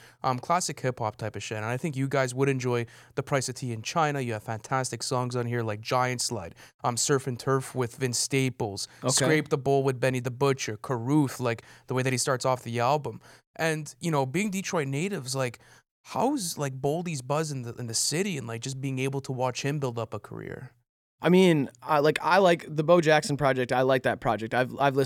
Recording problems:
abrupt cut into speech; at the end

